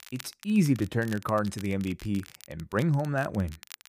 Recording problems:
crackle, like an old record; noticeable; 20 dB below the speech

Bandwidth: 15 kHz